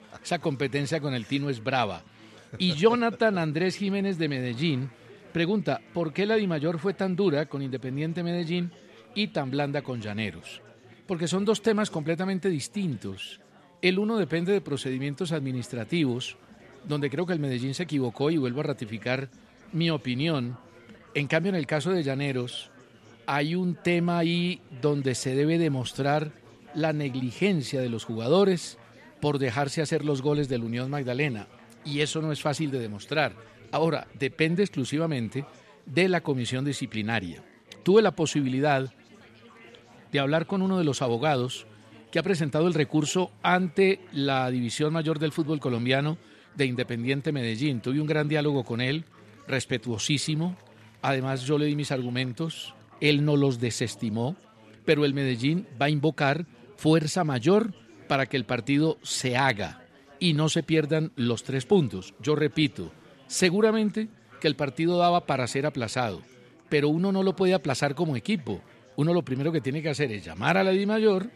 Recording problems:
chatter from many people; faint; throughout; 25 dB below the speech

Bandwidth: 13.5 kHz